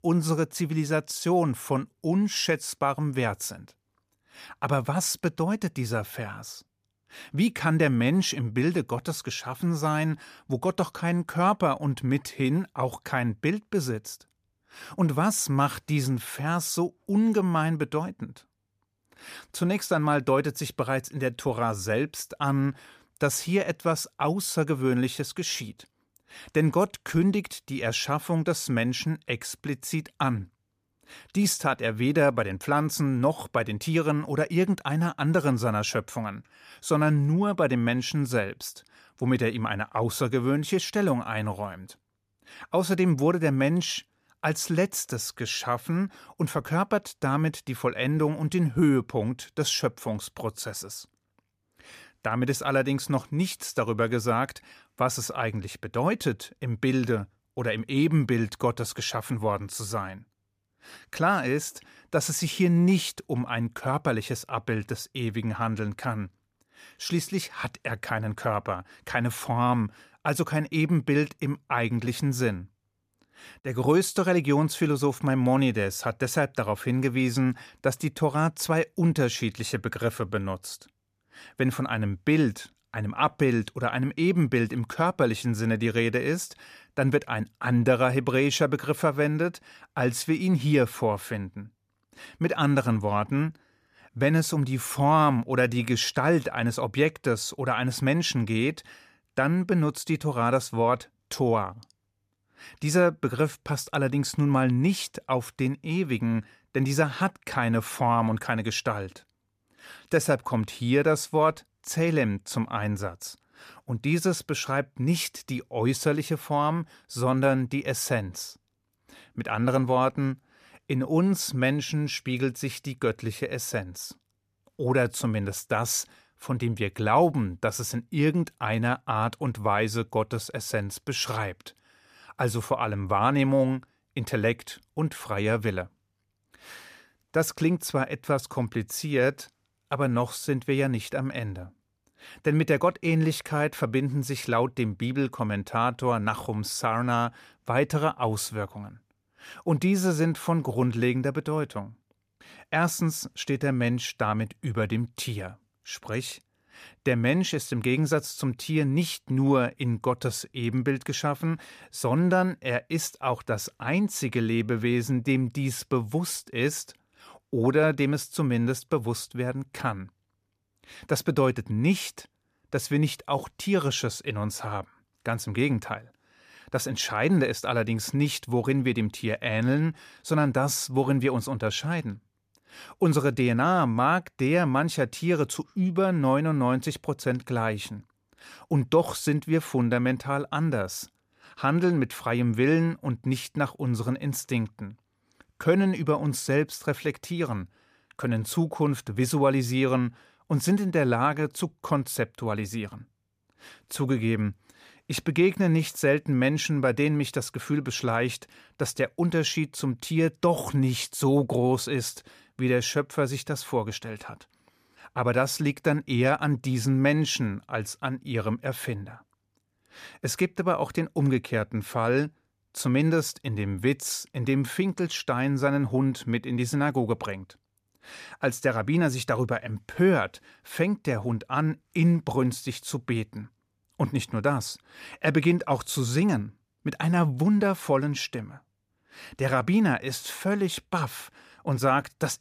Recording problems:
none

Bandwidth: 15 kHz